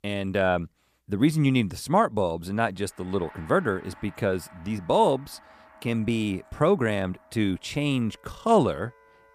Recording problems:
background music; faint; from 3 s on; 25 dB below the speech

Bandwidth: 15 kHz